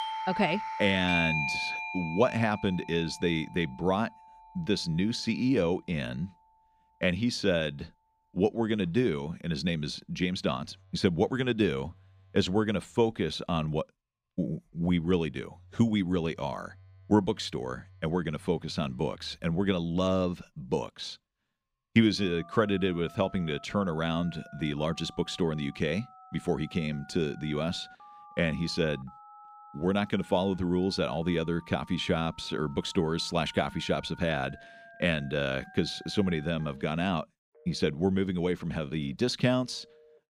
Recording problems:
alarms or sirens; noticeable; throughout; 10 dB below the speech

